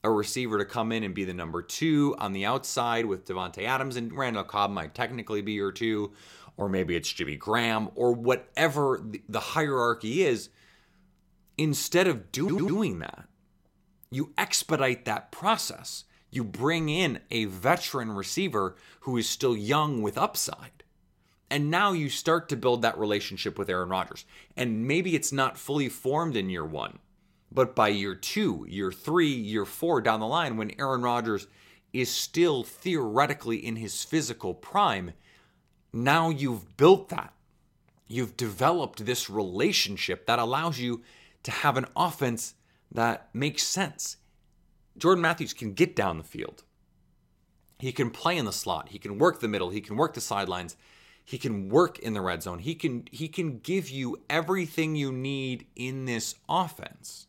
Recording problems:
audio stuttering; at 12 s

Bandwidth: 16 kHz